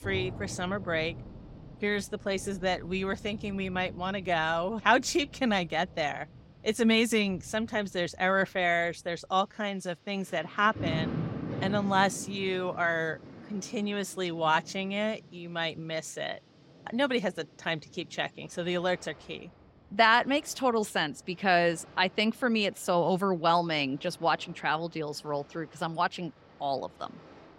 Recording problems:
rain or running water; noticeable; throughout; 15 dB below the speech

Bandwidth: 16 kHz